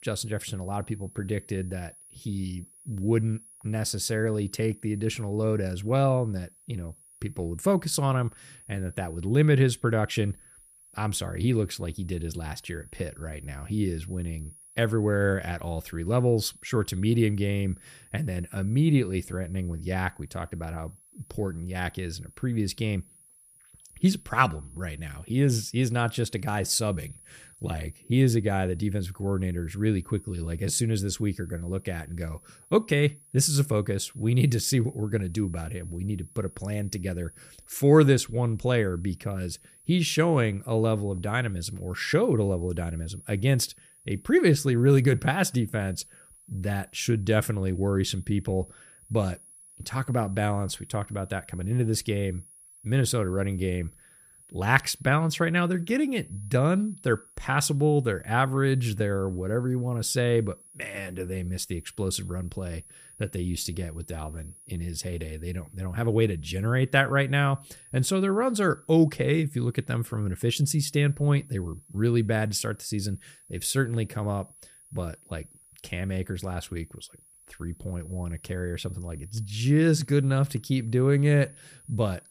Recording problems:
high-pitched whine; faint; throughout; 10.5 kHz, 25 dB below the speech

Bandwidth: 15 kHz